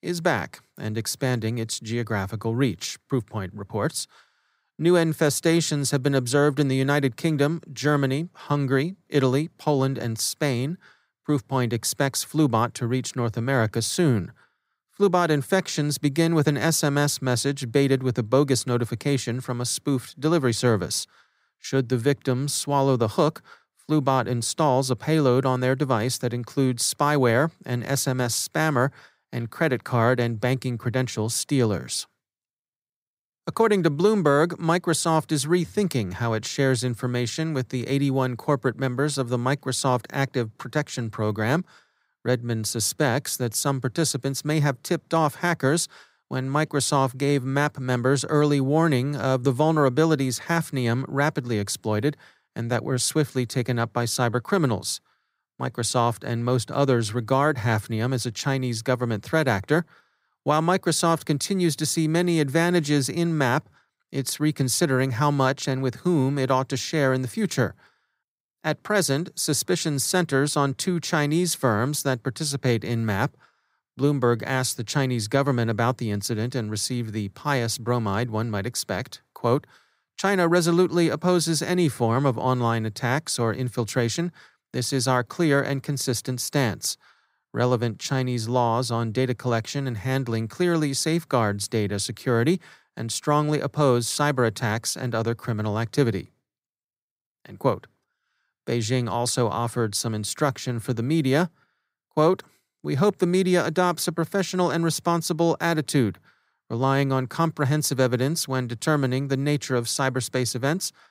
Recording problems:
none

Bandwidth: 15.5 kHz